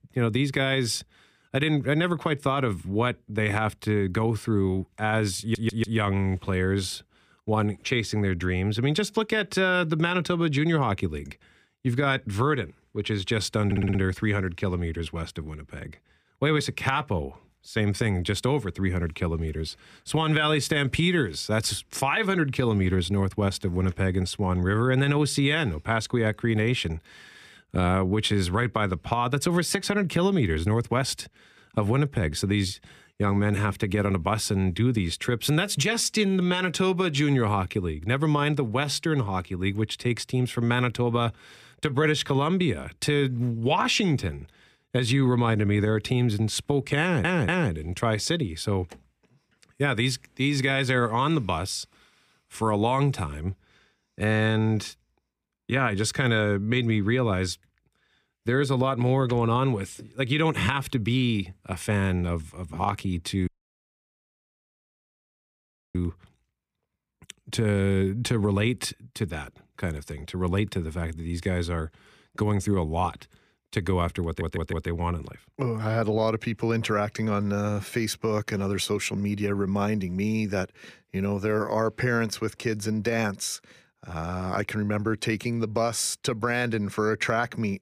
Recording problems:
audio stuttering; 4 times, first at 5.5 s
audio cutting out; at 1:03 for 2.5 s

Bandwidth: 15 kHz